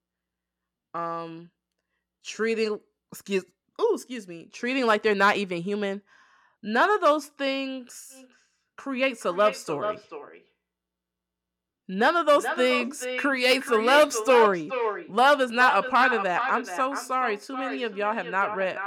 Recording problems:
echo of what is said; strong; from 8 s on; 430 ms later, 8 dB below the speech

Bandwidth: 17 kHz